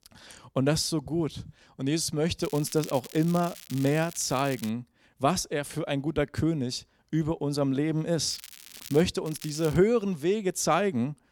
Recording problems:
crackling; noticeable; from 2.5 to 4.5 s, at 8.5 s and at 9.5 s; 15 dB below the speech

